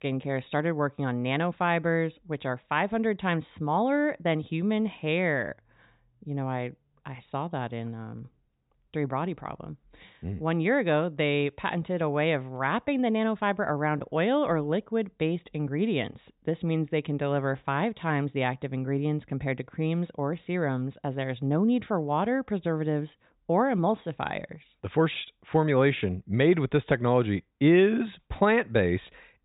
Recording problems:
high frequencies cut off; severe; nothing above 4 kHz

